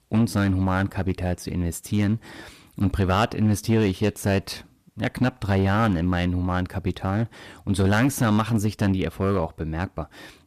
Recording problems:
distortion; slight; 3% of the sound clipped

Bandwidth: 14.5 kHz